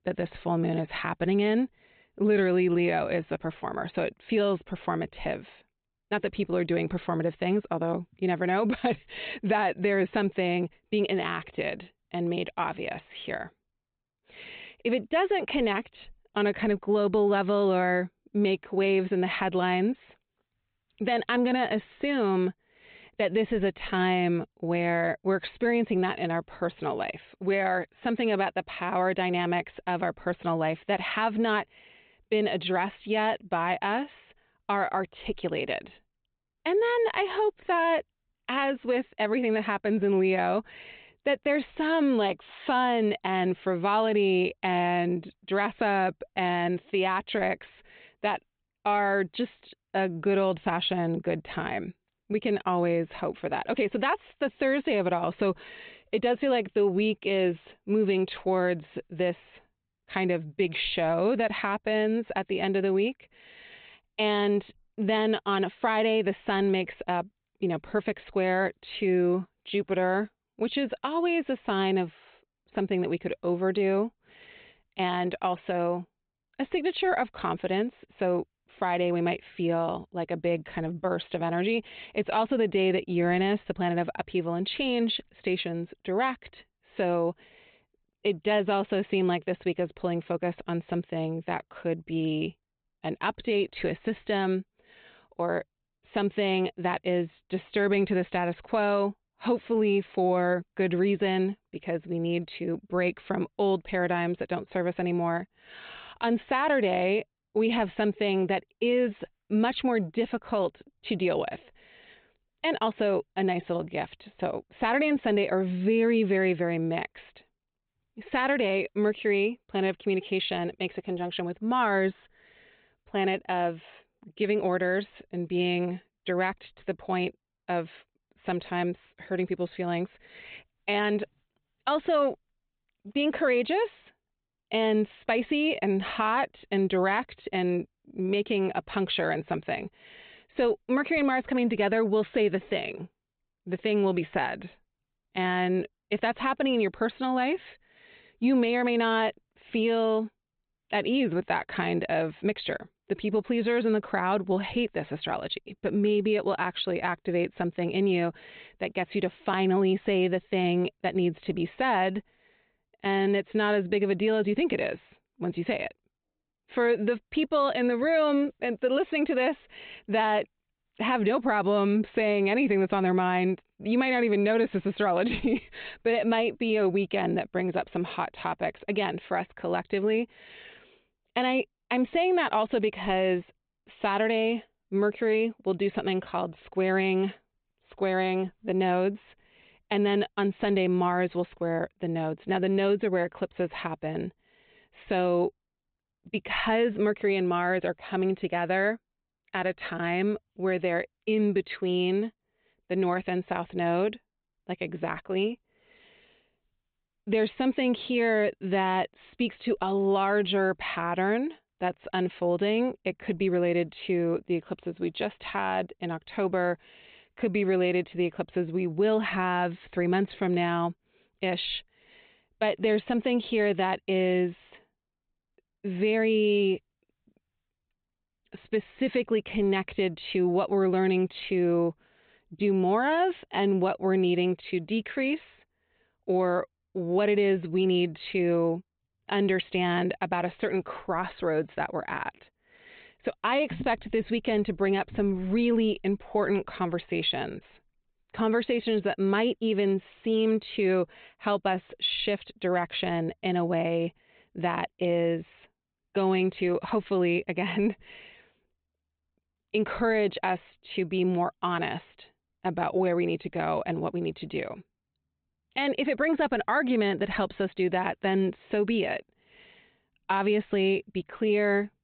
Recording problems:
high frequencies cut off; severe; nothing above 4 kHz

